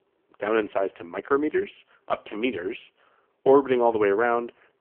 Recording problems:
phone-call audio; poor line; nothing above 3 kHz

